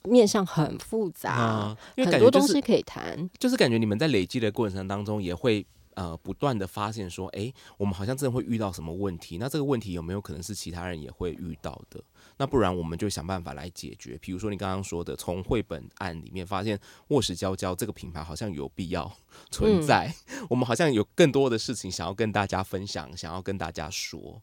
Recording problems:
none

